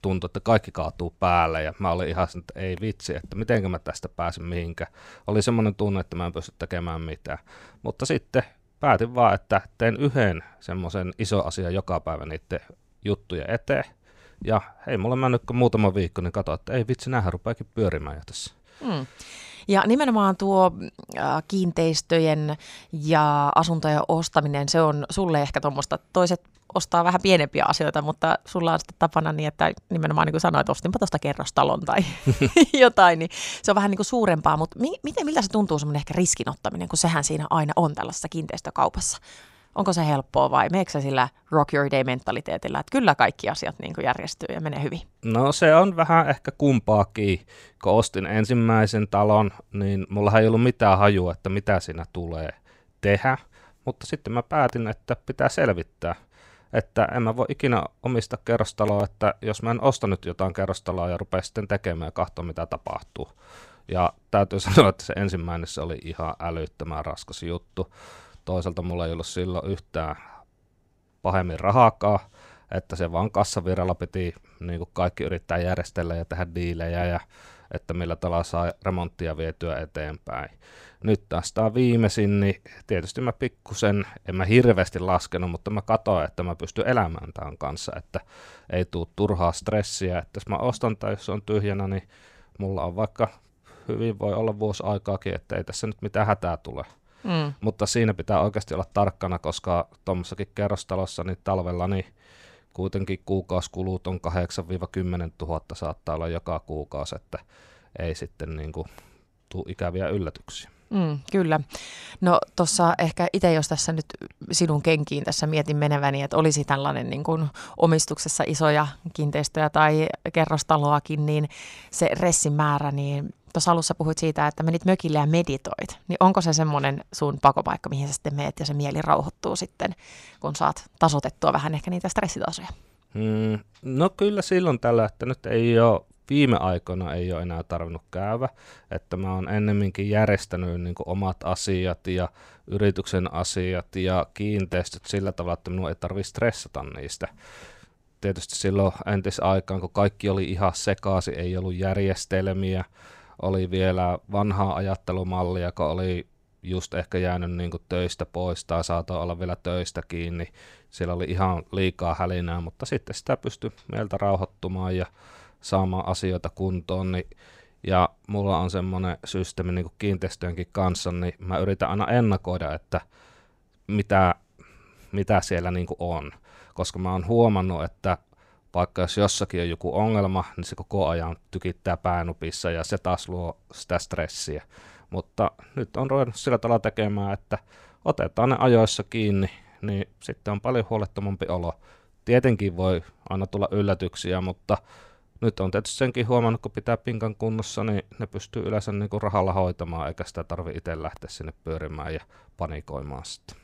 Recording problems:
none

